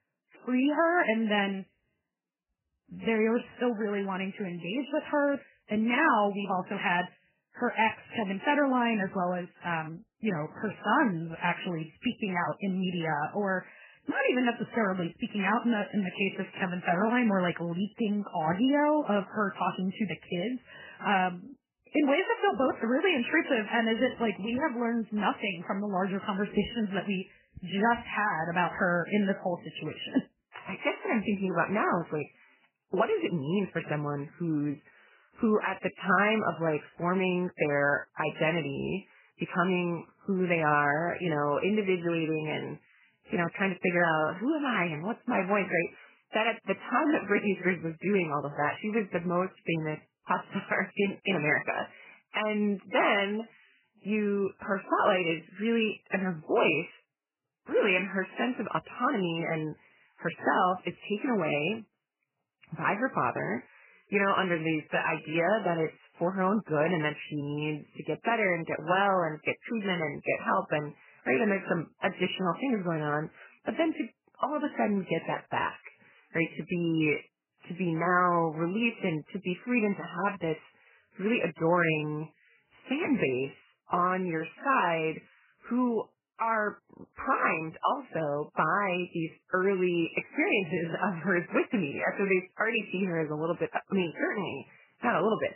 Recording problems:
garbled, watery; badly; nothing above 3 kHz

